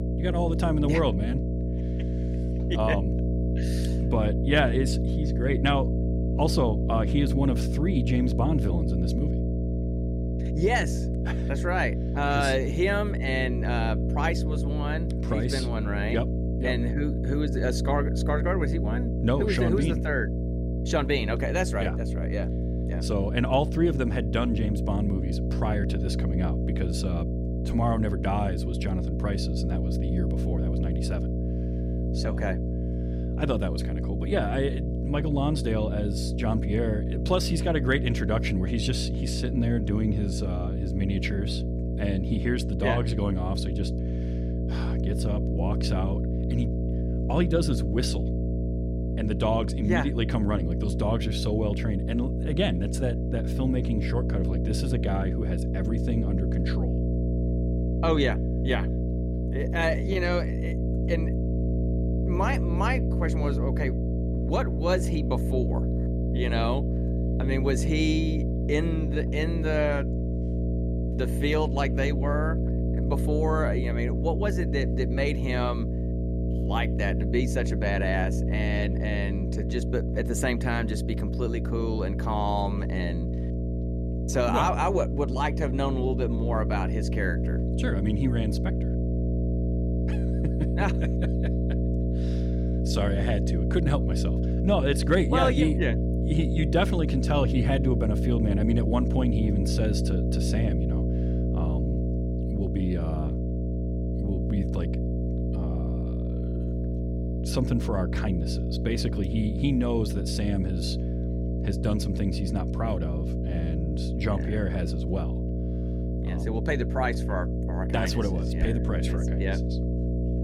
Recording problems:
electrical hum; loud; throughout; 60 Hz, 6 dB below the speech

